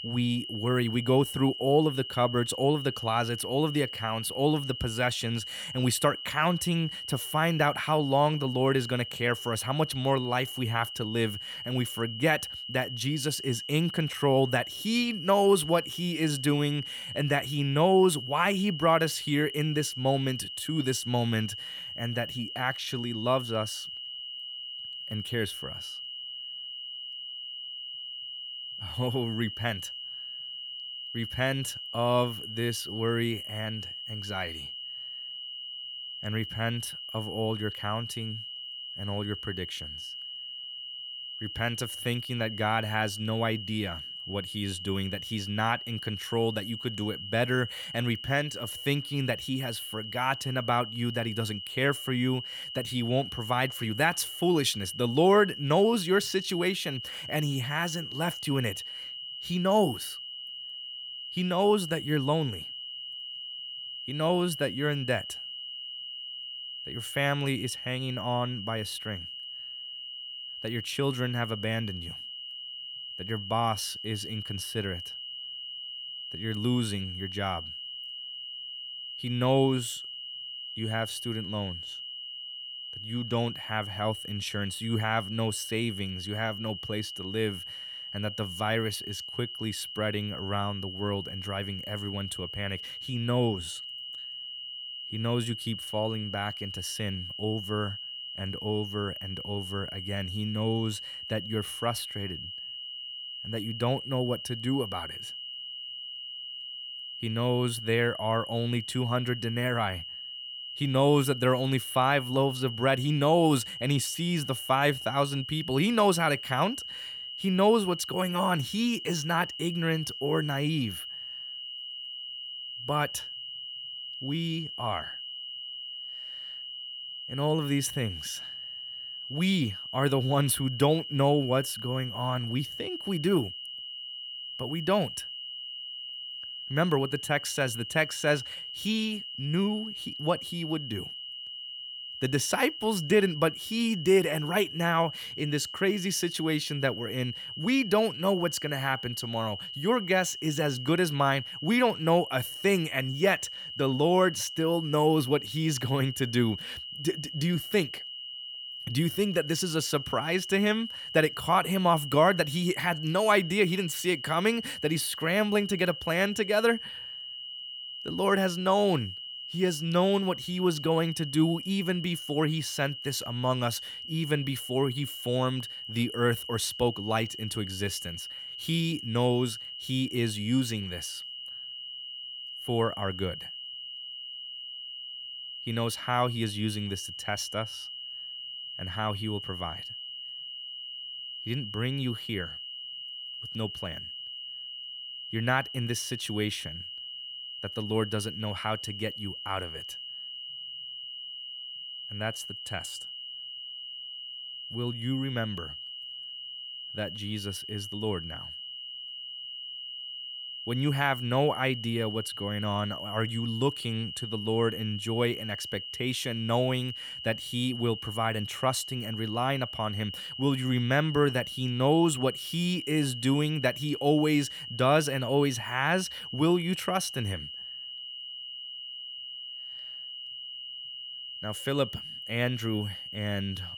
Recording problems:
high-pitched whine; loud; throughout; 3 kHz, 8 dB below the speech

